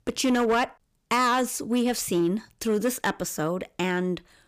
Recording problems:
distortion; slight; 7% of the sound clipped

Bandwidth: 15 kHz